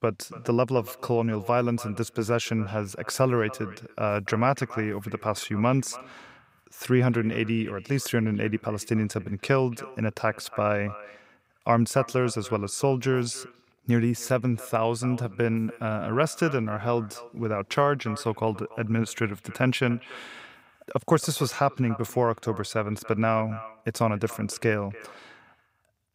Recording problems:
echo of what is said; faint; throughout; 290 ms later, 20 dB below the speech

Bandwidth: 15.5 kHz